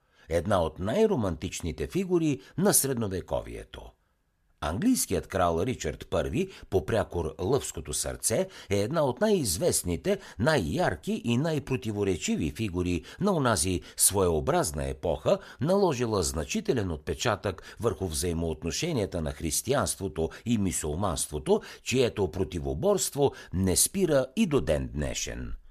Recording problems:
none

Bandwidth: 14.5 kHz